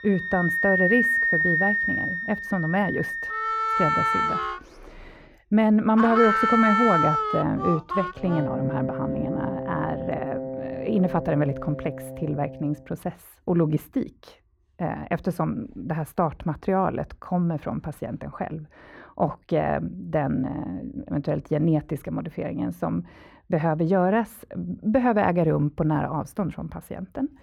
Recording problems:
muffled; very; fading above 3 kHz
background music; very loud; until 13 s; 1 dB above the speech

